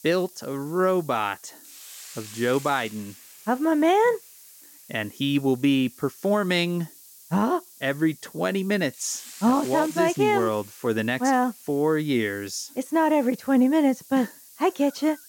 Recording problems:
hiss; noticeable; throughout; 20 dB below the speech

